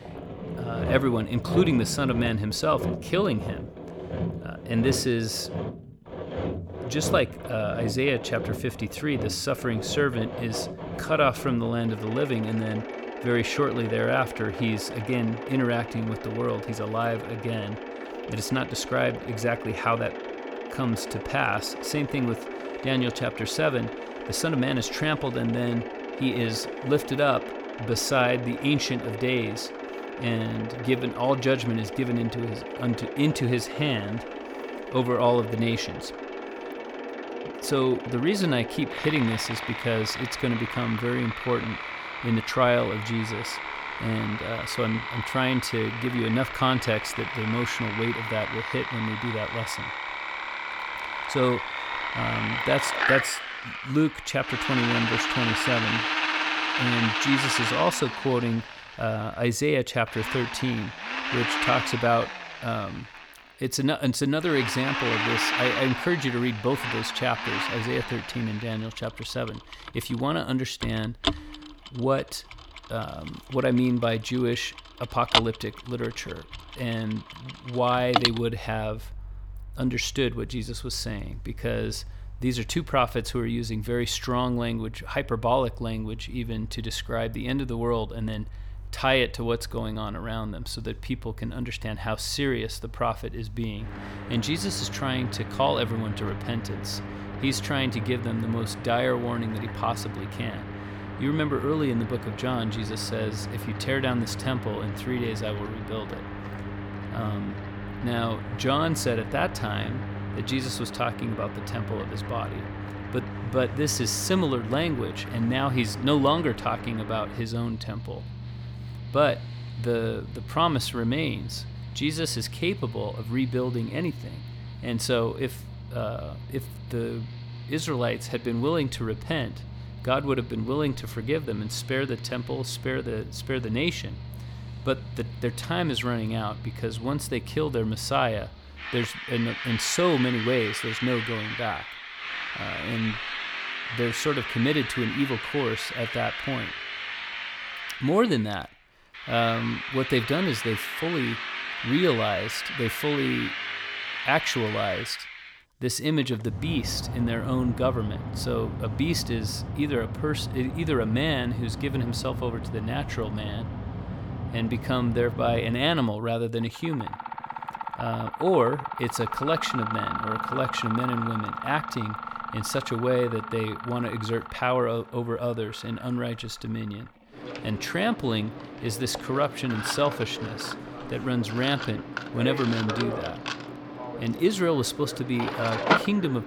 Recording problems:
machinery noise; loud; throughout; 5 dB below the speech

